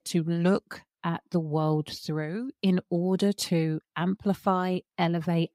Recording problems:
none

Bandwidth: 15.5 kHz